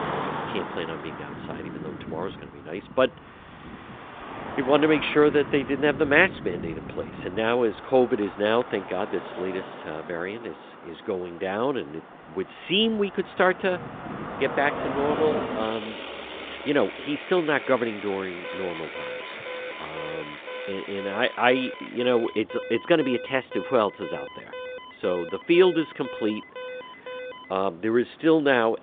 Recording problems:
phone-call audio
traffic noise; noticeable; throughout; 10 dB below the speech
alarm; faint; from 18 to 28 s; peak 10 dB below the speech

